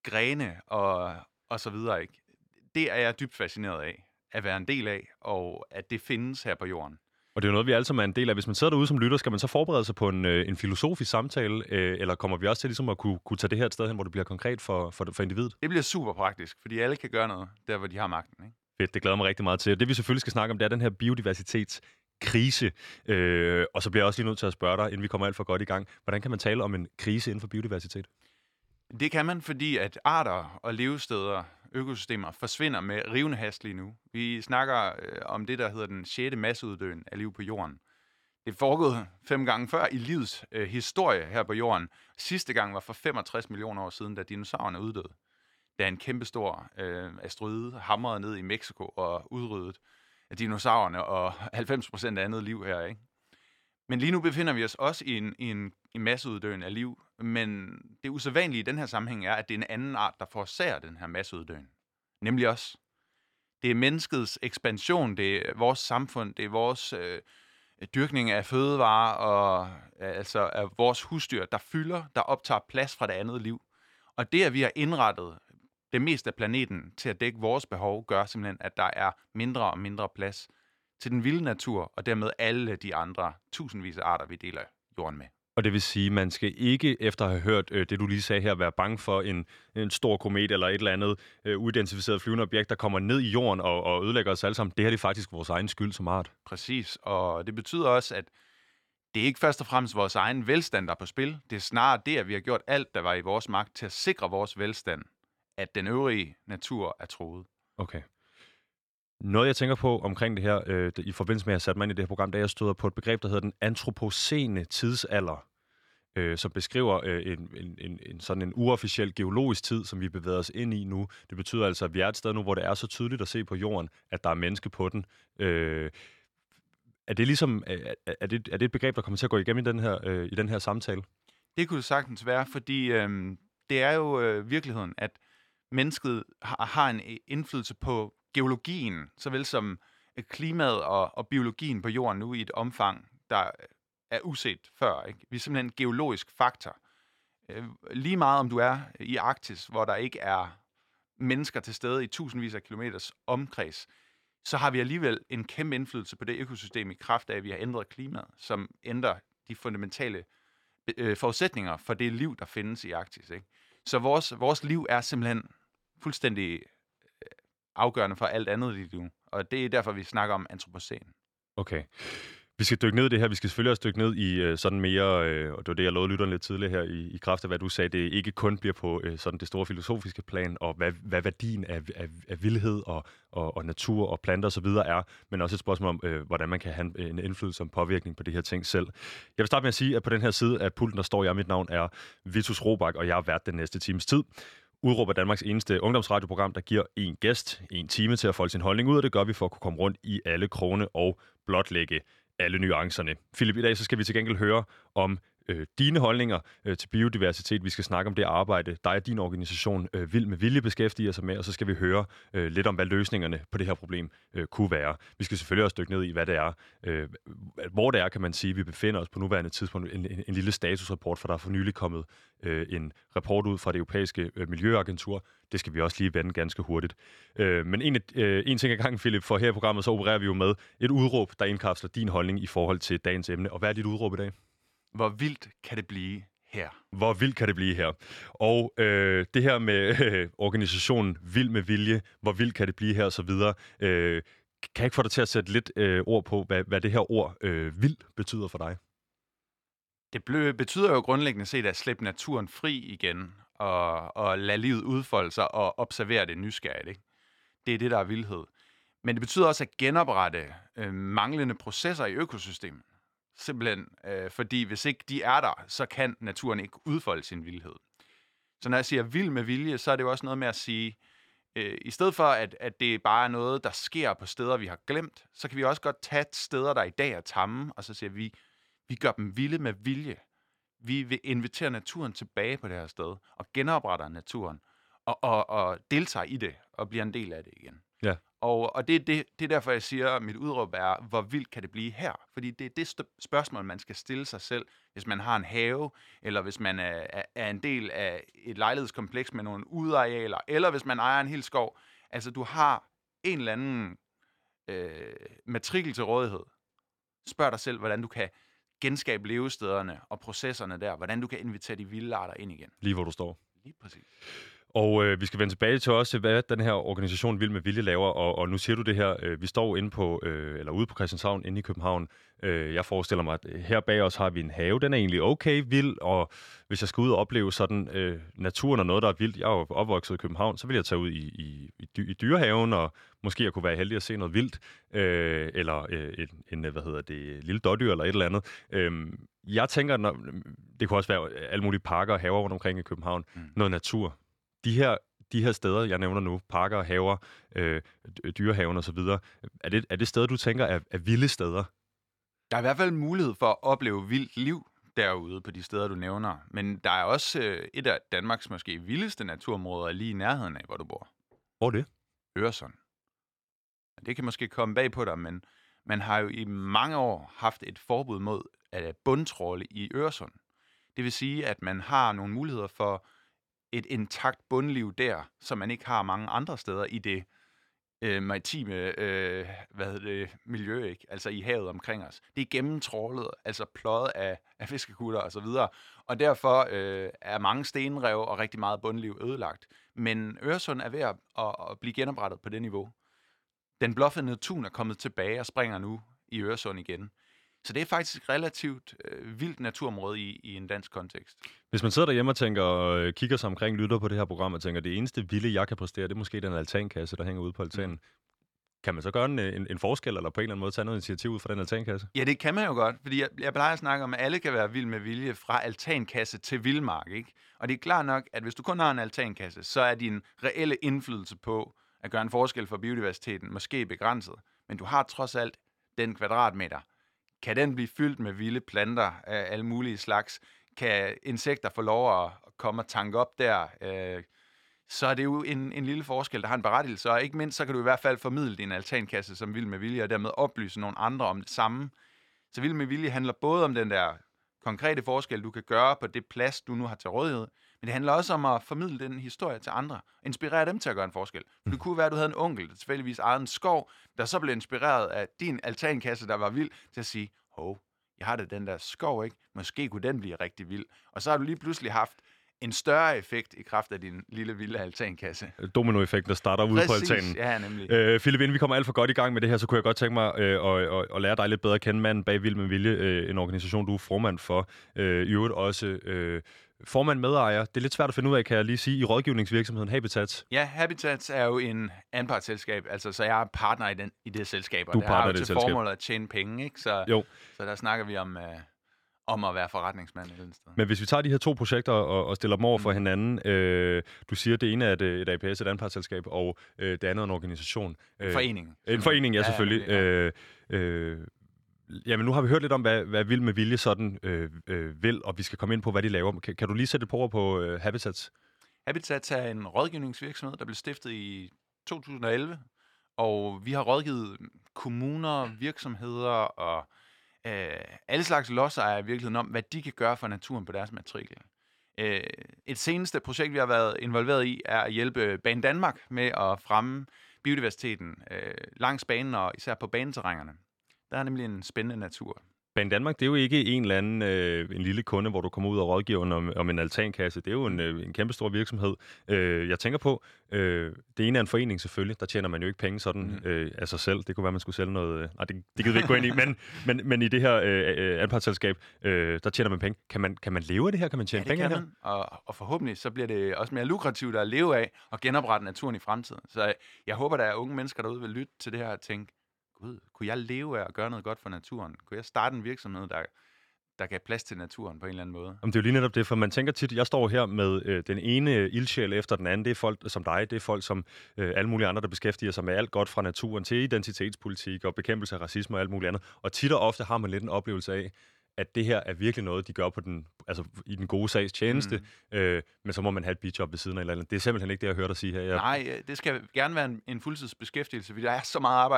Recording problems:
abrupt cut into speech; at the end

